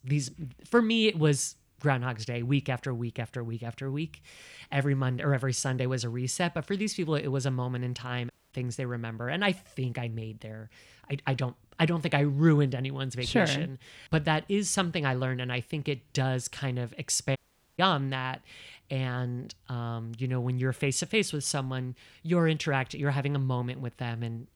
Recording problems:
audio cutting out; at 8.5 s and at 17 s

